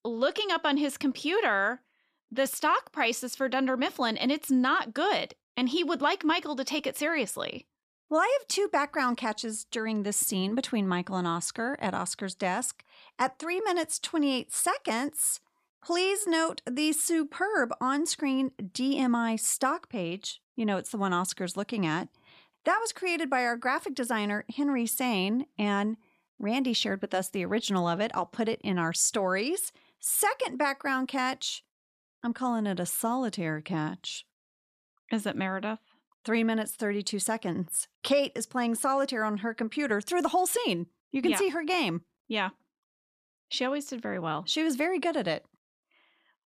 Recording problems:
none

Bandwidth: 14.5 kHz